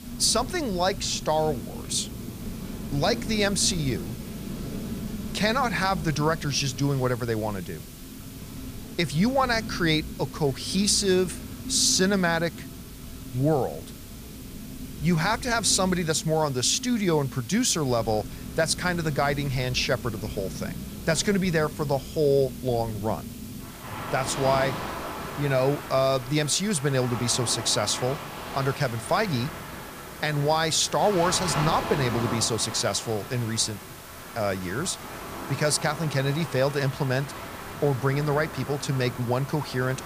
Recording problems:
rain or running water; noticeable; throughout; 10 dB below the speech
hiss; faint; throughout; 20 dB below the speech

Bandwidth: 15 kHz